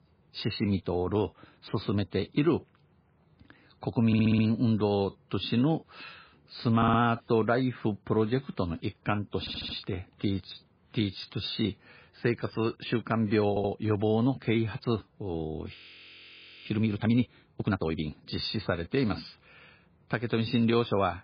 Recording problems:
garbled, watery; badly; nothing above 4.5 kHz
audio stuttering; 4 times, first at 4 s
audio freezing; at 16 s for 1 s

